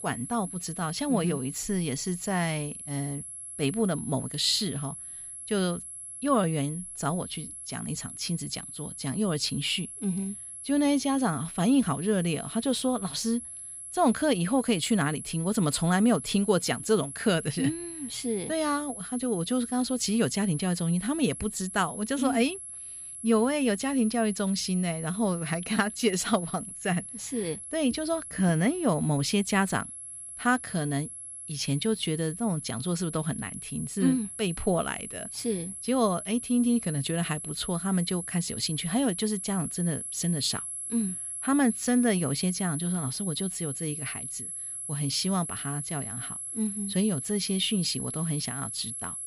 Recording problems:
high-pitched whine; loud; throughout; 11 kHz, 8 dB below the speech

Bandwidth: 15.5 kHz